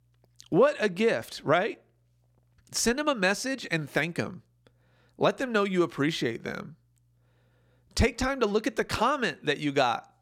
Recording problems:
none

